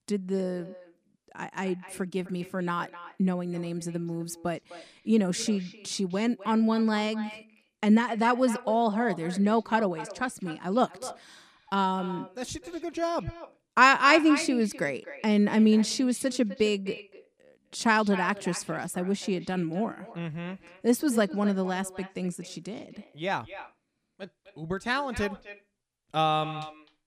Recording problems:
echo of what is said; noticeable; throughout; 260 ms later, 15 dB below the speech

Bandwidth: 14.5 kHz